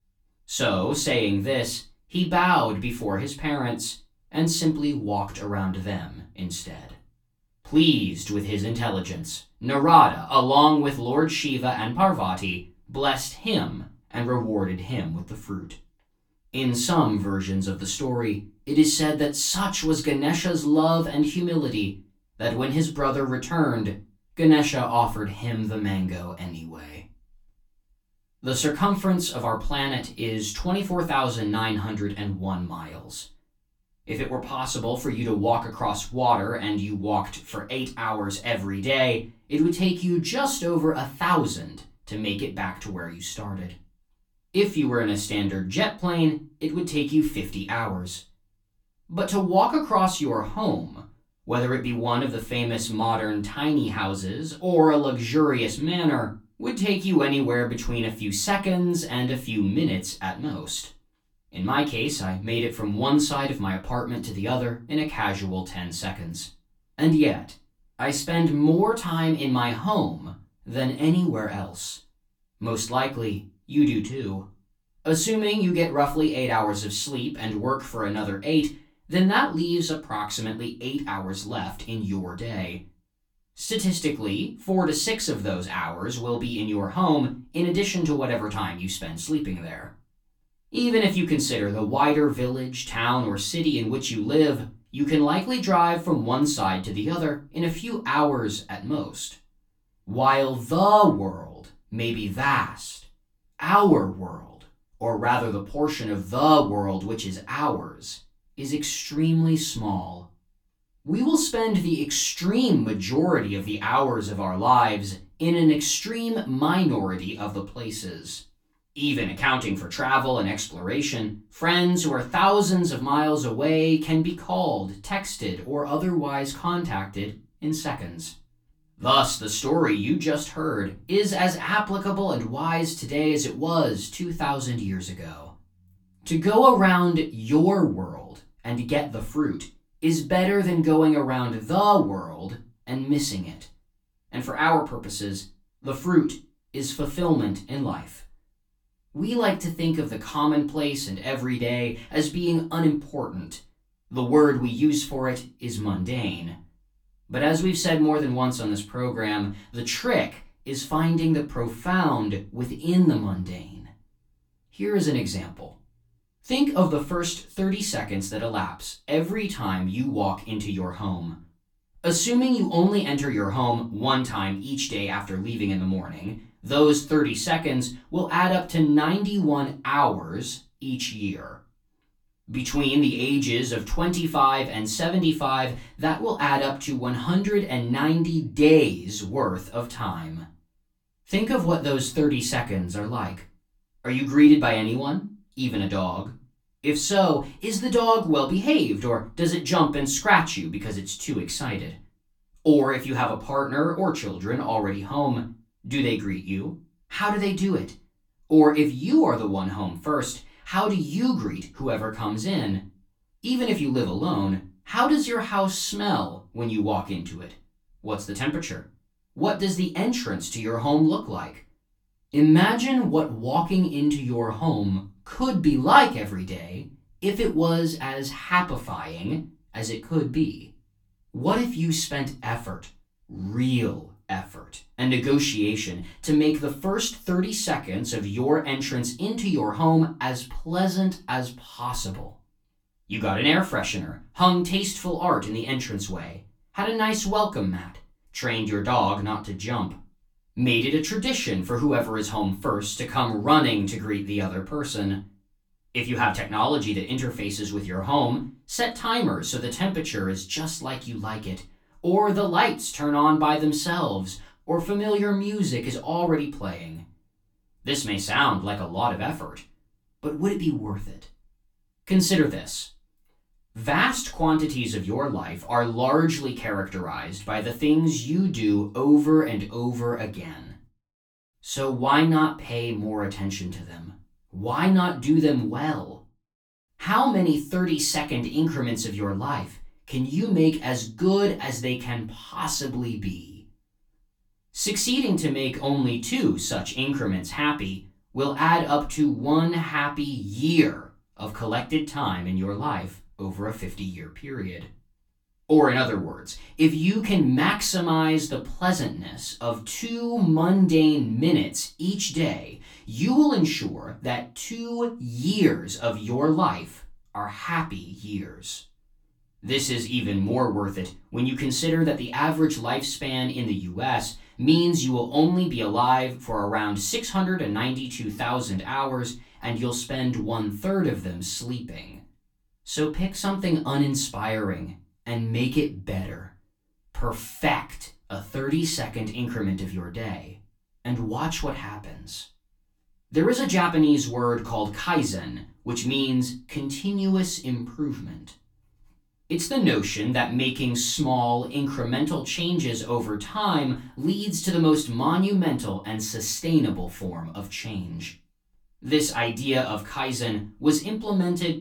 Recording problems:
off-mic speech; far
room echo; very slight; dies away in 0.2 s

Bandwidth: 18.5 kHz